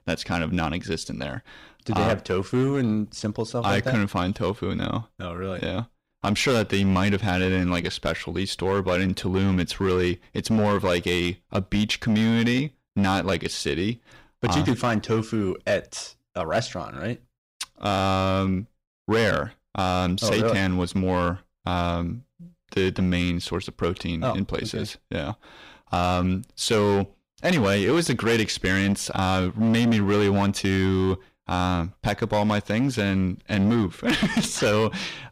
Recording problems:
distortion; slight; 8% of the sound clipped

